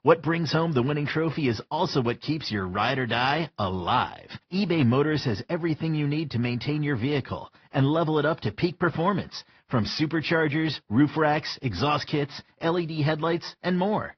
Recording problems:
high frequencies cut off; noticeable; nothing above 5.5 kHz
garbled, watery; slightly

